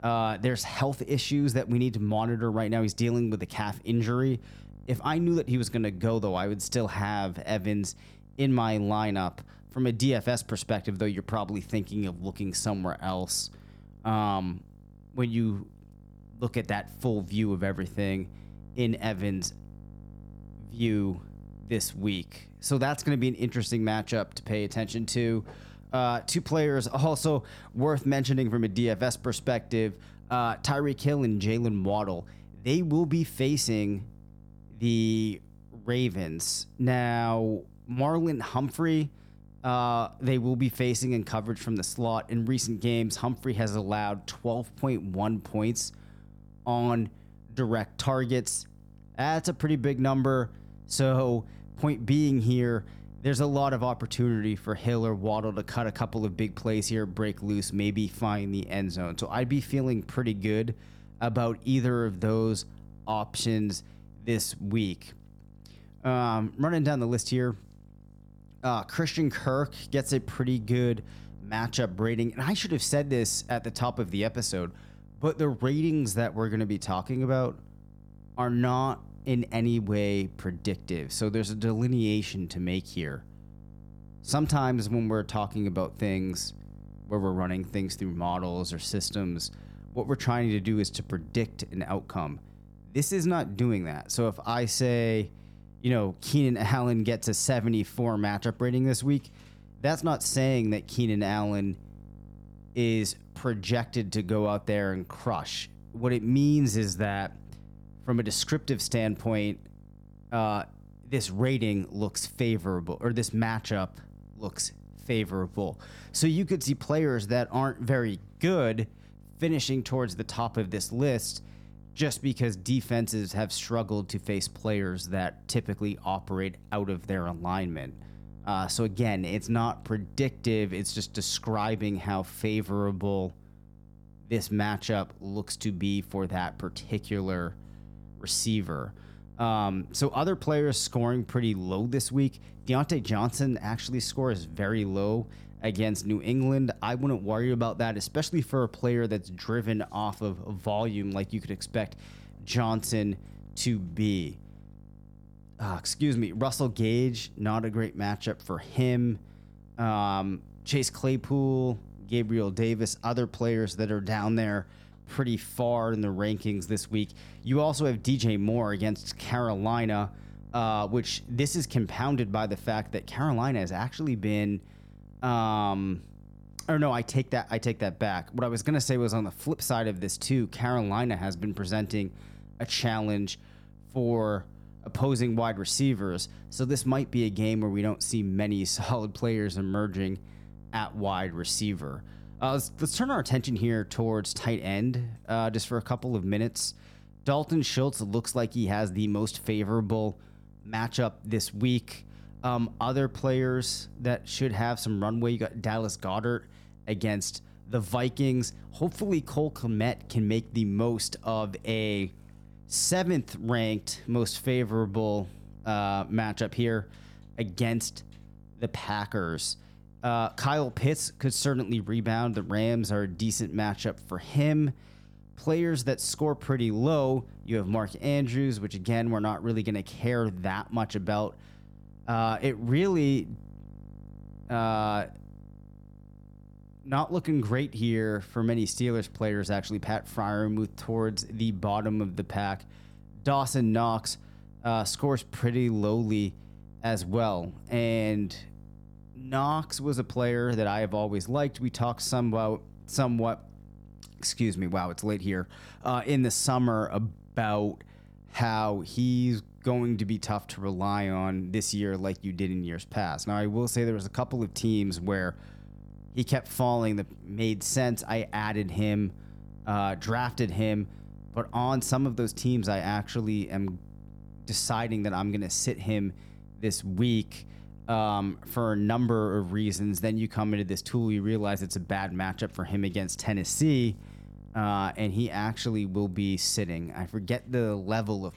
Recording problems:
electrical hum; faint; throughout; 50 Hz, 30 dB below the speech

